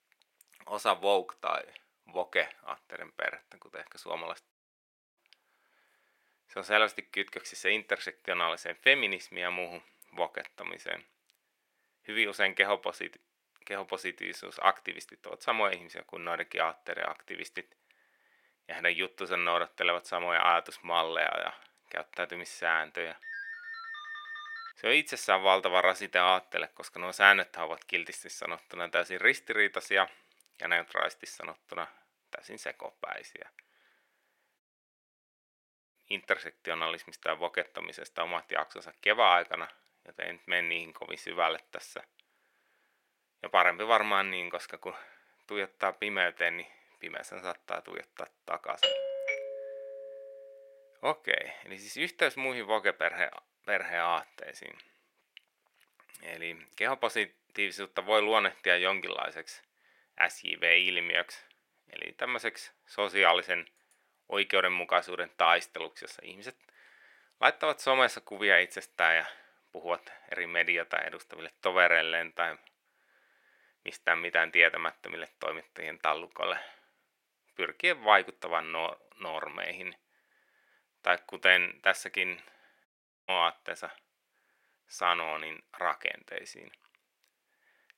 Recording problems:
thin; very; fading below 500 Hz
audio cutting out; at 4.5 s for 0.5 s, at 35 s for 1.5 s and at 1:23
phone ringing; faint; from 23 to 25 s; peak 10 dB below the speech
doorbell; loud; at 49 s; peak 2 dB above the speech

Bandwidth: 16.5 kHz